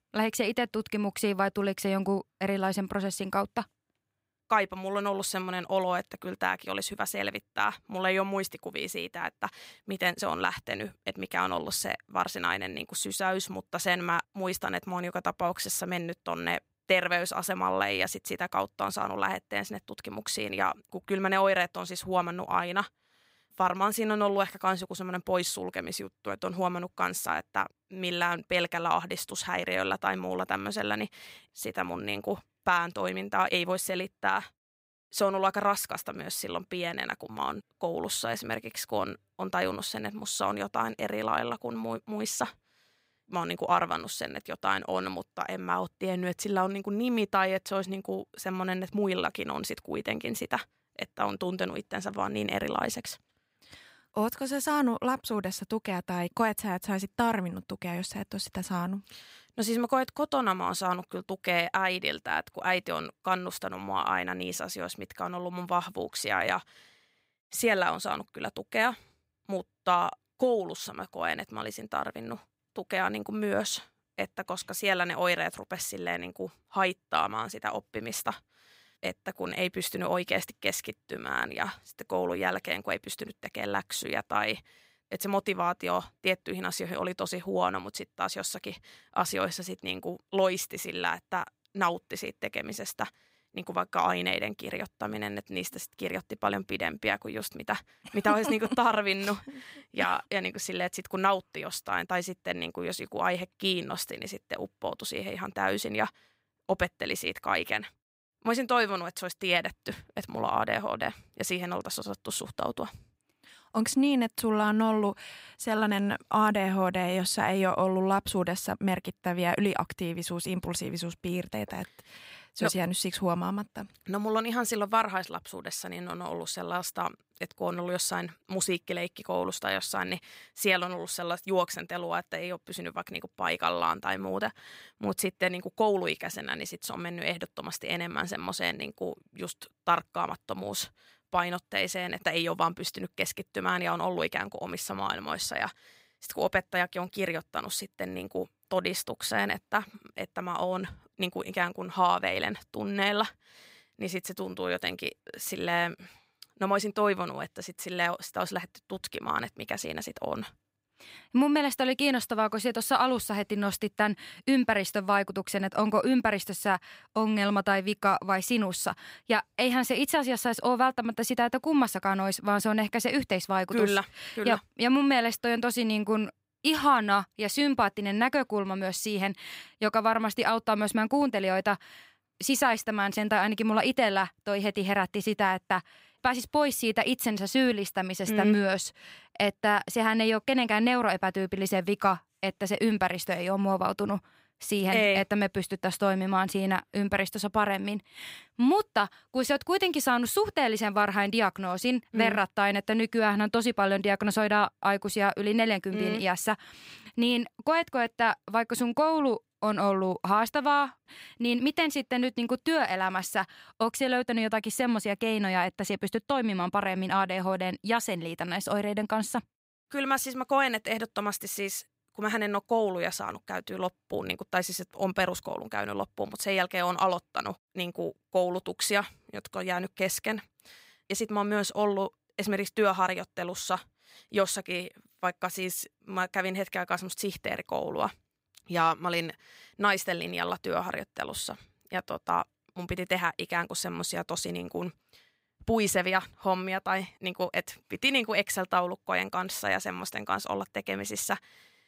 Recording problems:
none

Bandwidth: 15.5 kHz